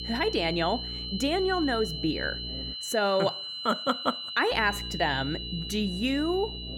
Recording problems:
high-pitched whine; loud; throughout; 4 kHz, 6 dB below the speech
electrical hum; faint; until 2.5 s and from 4.5 s on; 60 Hz, 20 dB below the speech

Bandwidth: 17.5 kHz